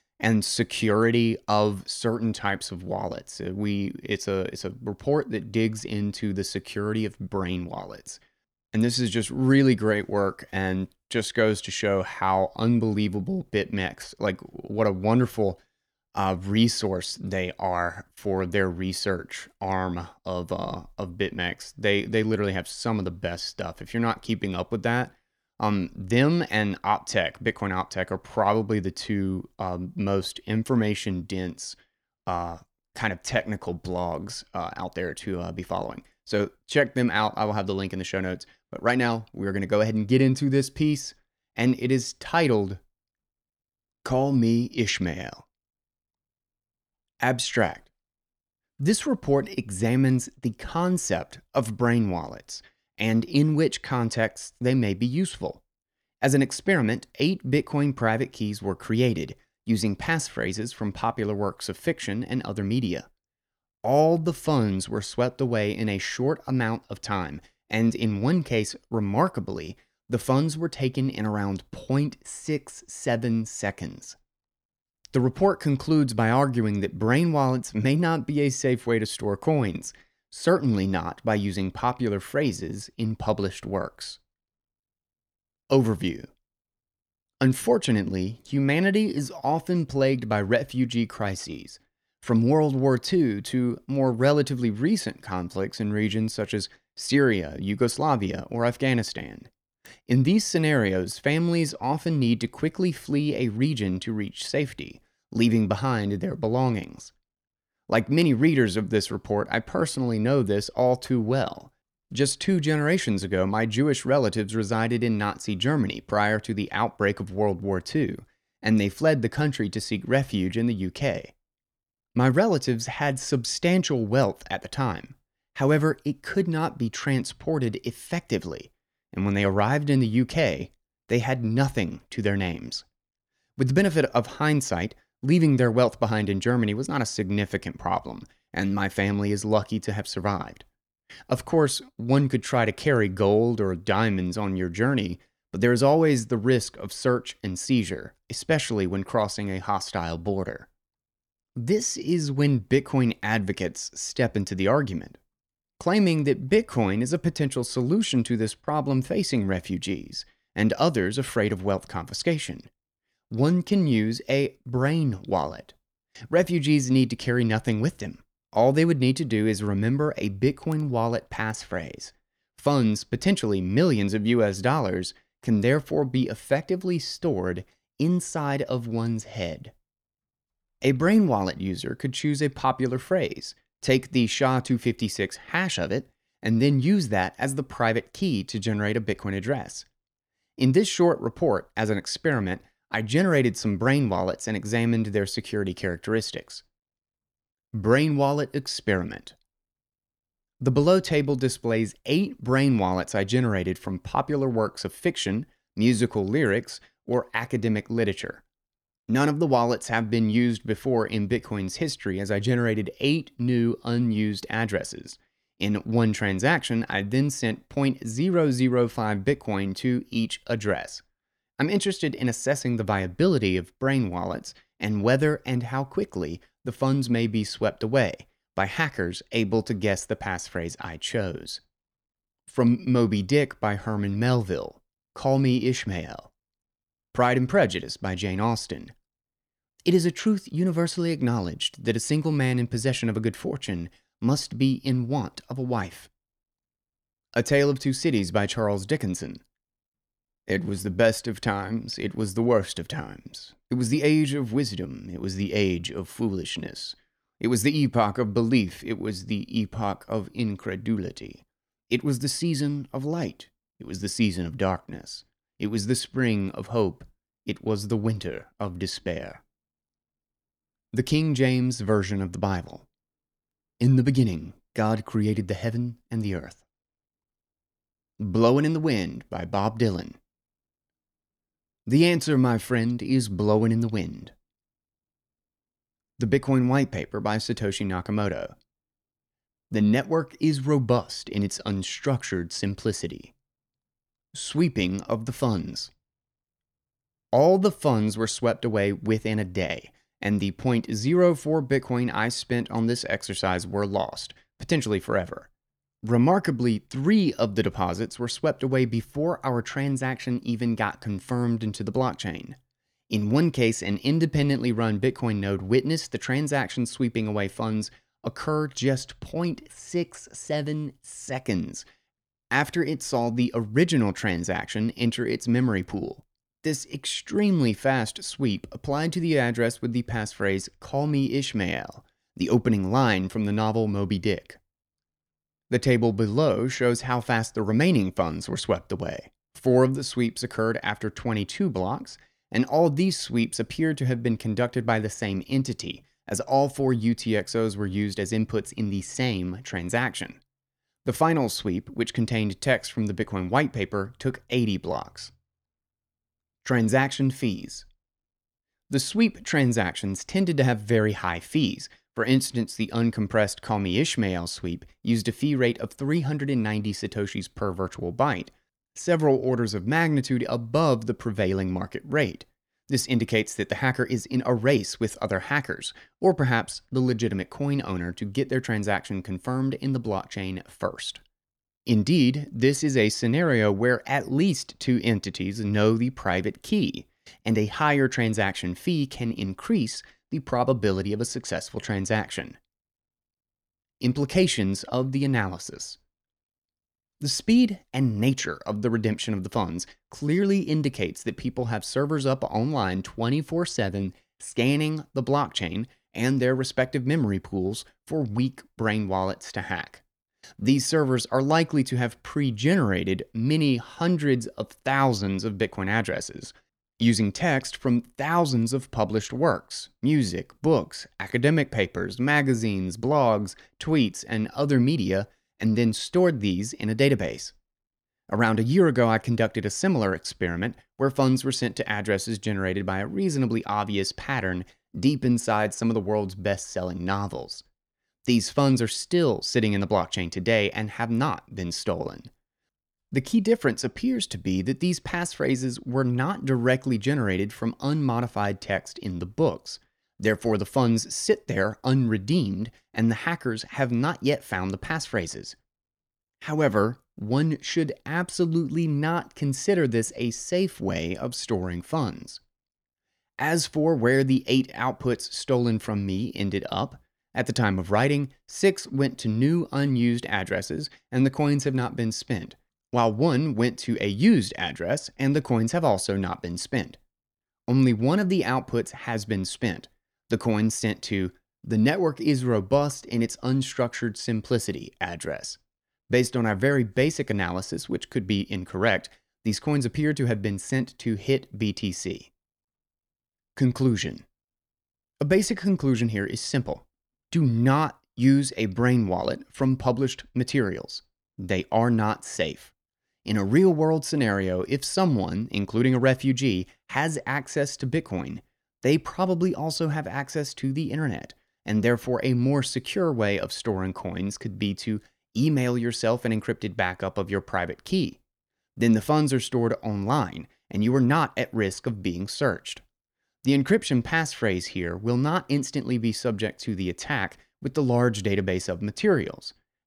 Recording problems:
none

